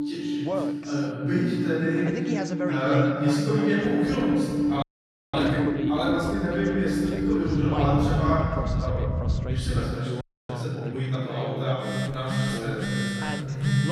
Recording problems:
room echo; strong; dies away in 2.2 s
off-mic speech; far
alarms or sirens; loud; throughout; 1 dB below the speech
voice in the background; loud; throughout; 9 dB below the speech
low rumble; noticeable; from 4 to 10 s; 15 dB below the speech
audio freezing; at 5 s for 0.5 s and at 10 s

